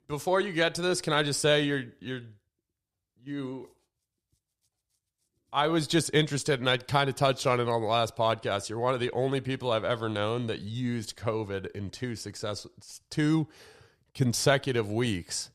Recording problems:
none

